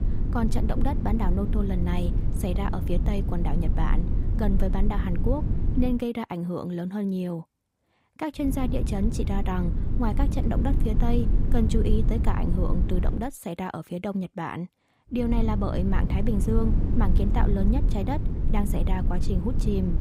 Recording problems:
low rumble; loud; until 6 s, from 8.5 to 13 s and from 15 s on; 7 dB below the speech

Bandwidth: 15.5 kHz